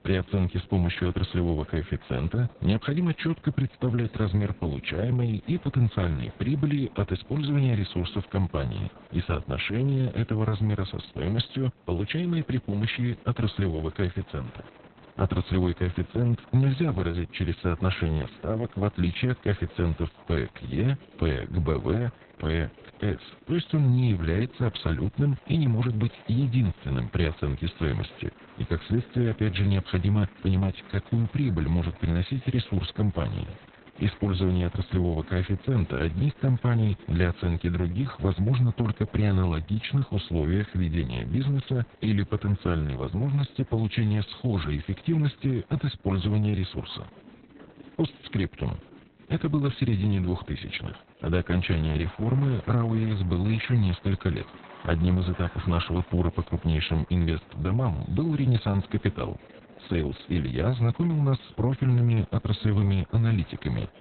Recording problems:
garbled, watery; badly; nothing above 4 kHz
chatter from many people; faint; throughout; 25 dB below the speech

